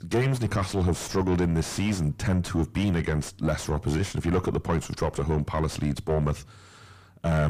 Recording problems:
distortion; heavy; 4 dB below the speech
abrupt cut into speech; at the end

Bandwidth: 15 kHz